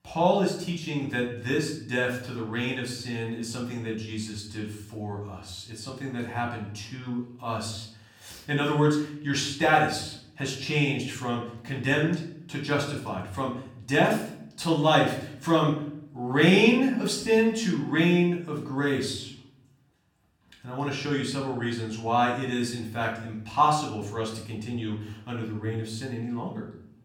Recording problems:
off-mic speech; far
room echo; slight; dies away in 0.6 s

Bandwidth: 17.5 kHz